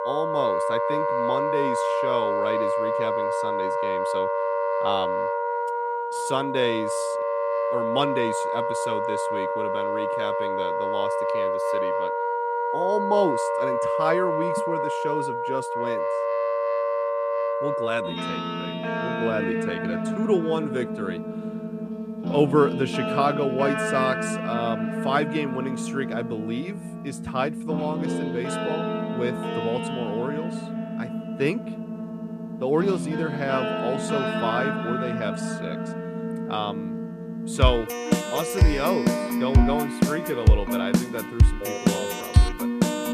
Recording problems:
background music; very loud; throughout; 3 dB above the speech

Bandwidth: 14.5 kHz